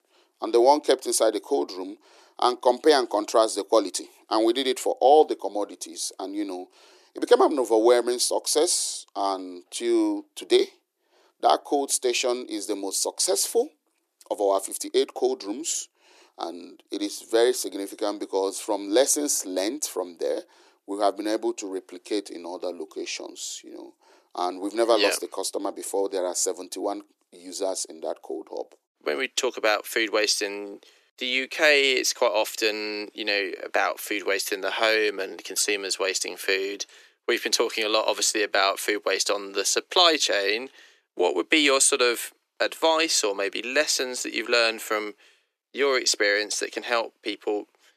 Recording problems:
thin; somewhat; fading below 300 Hz

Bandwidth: 14 kHz